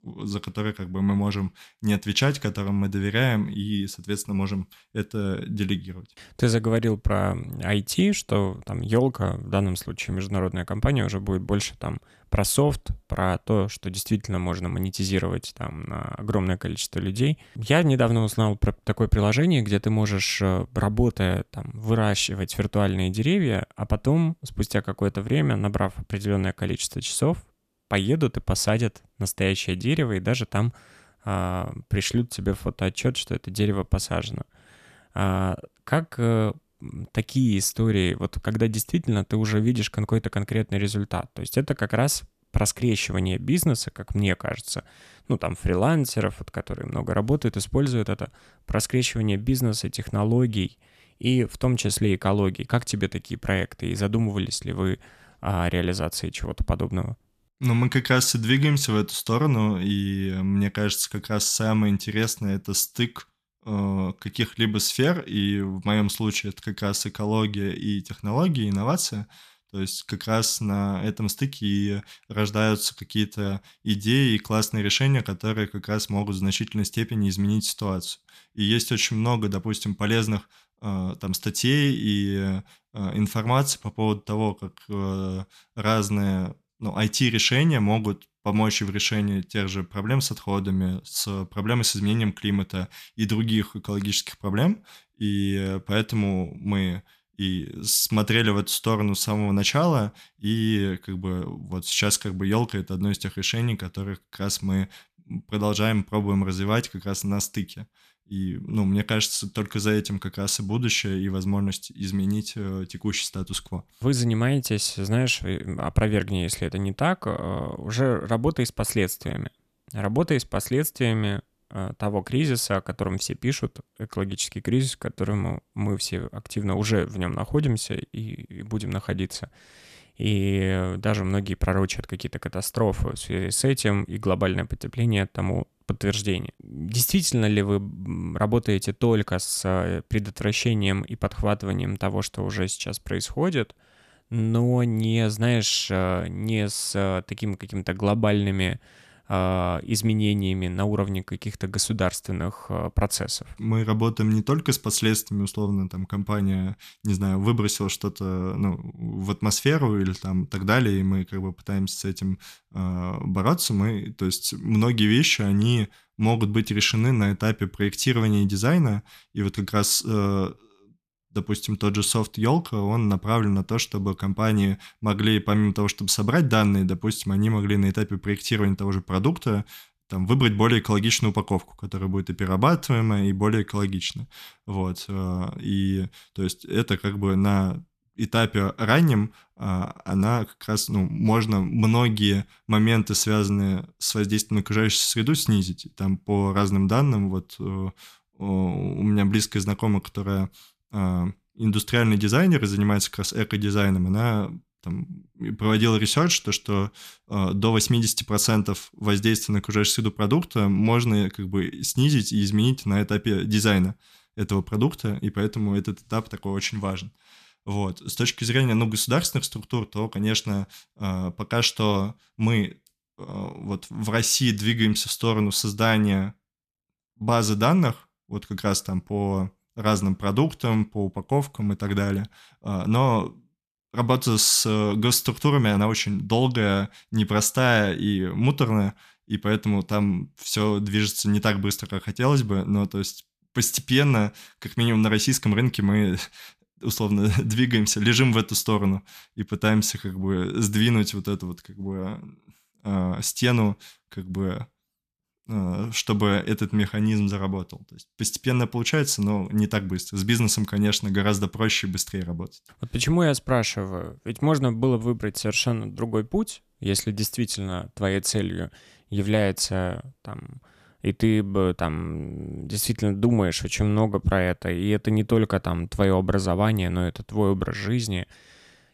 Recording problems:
none

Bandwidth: 14.5 kHz